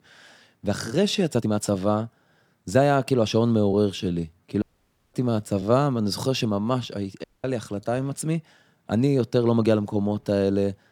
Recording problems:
uneven, jittery; strongly; from 0.5 to 10 s
audio cutting out; at 4.5 s for 0.5 s and at 7 s

